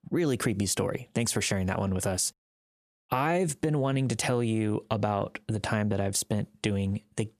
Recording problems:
squashed, flat; somewhat

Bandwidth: 14.5 kHz